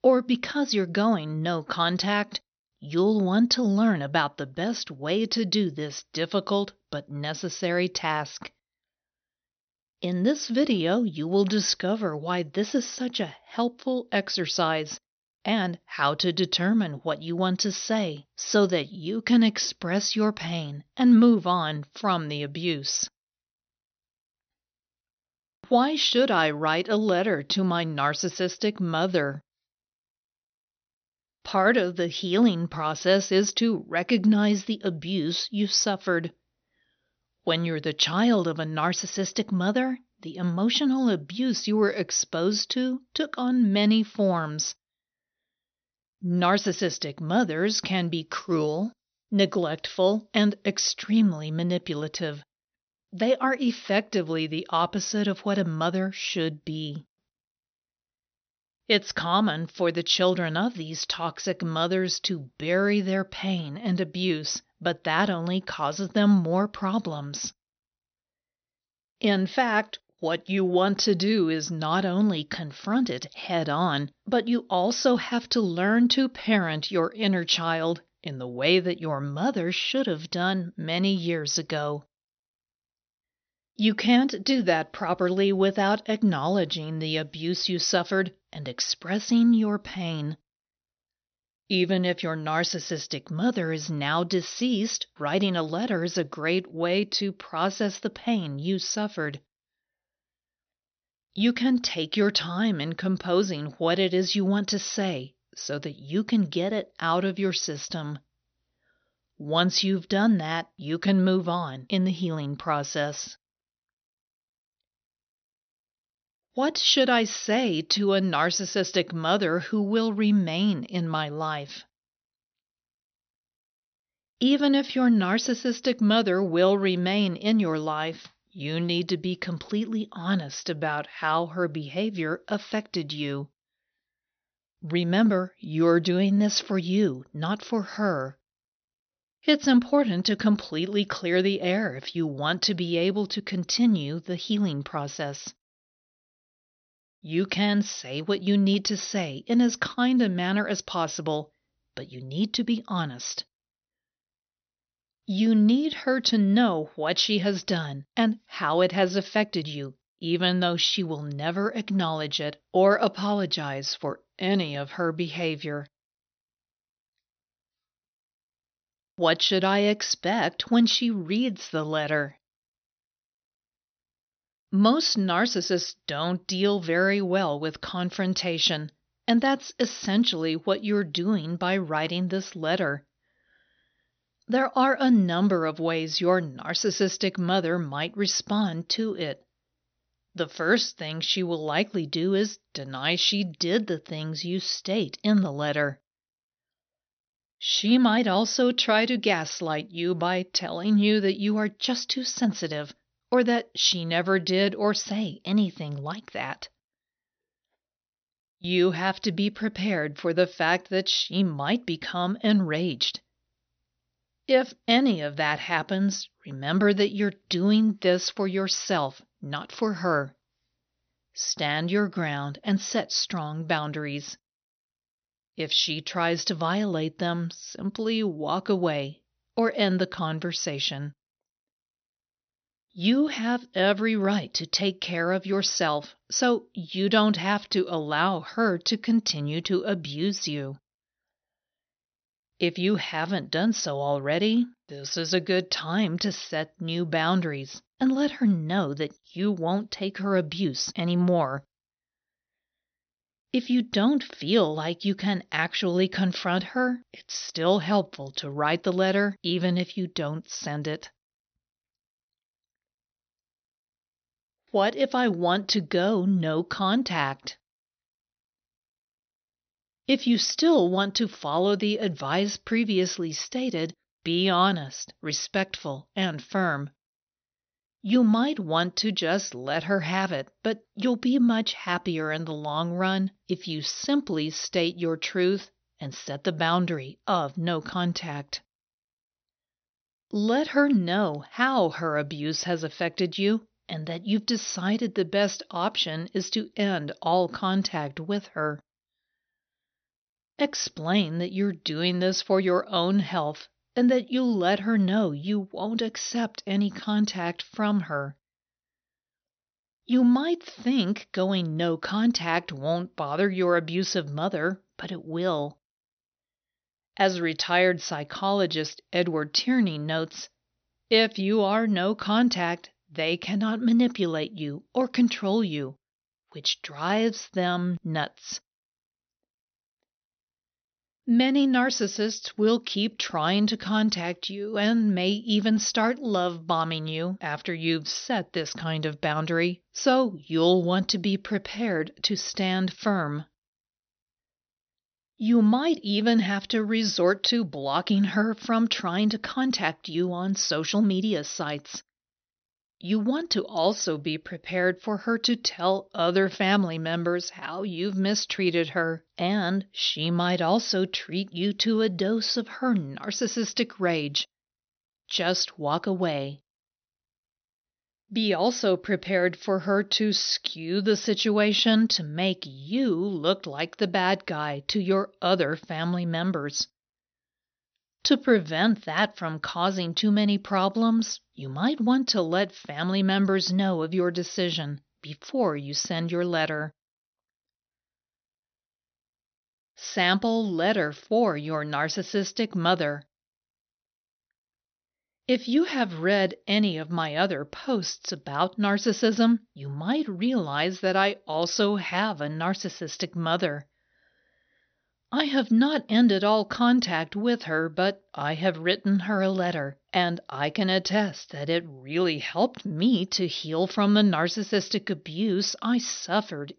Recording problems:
high frequencies cut off; noticeable; nothing above 6 kHz

